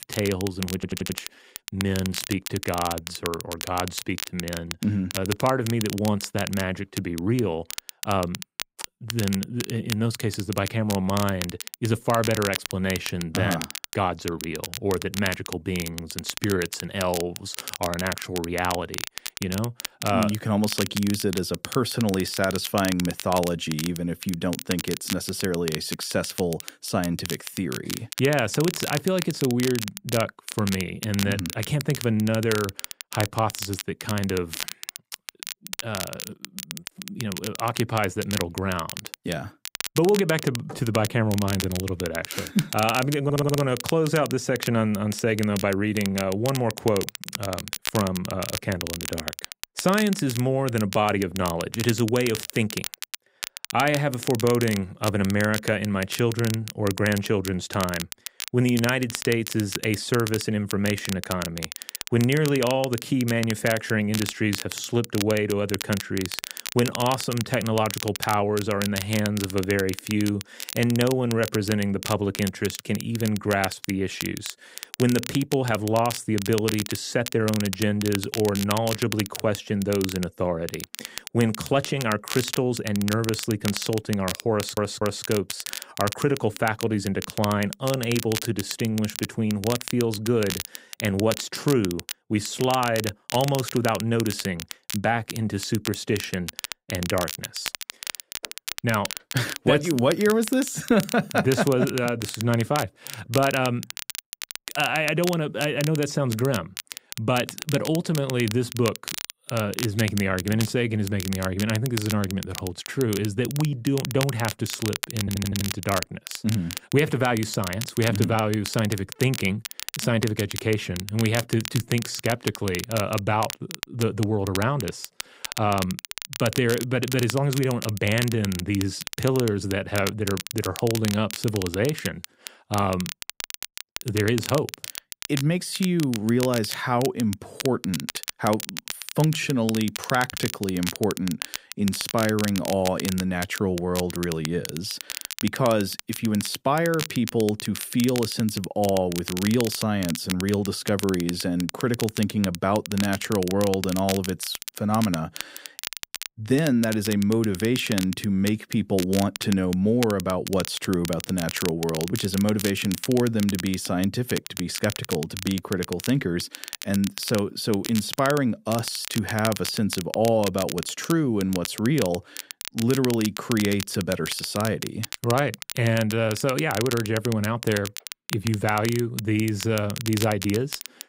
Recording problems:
crackle, like an old record; loud; 8 dB below the speech
audio stuttering; 4 times, first at 0.5 s

